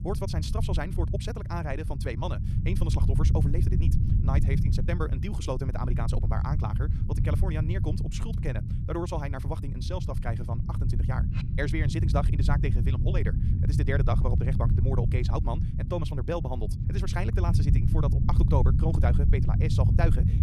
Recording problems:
wrong speed, natural pitch; too fast; 1.7 times normal speed
low rumble; loud; throughout; 5 dB below the speech

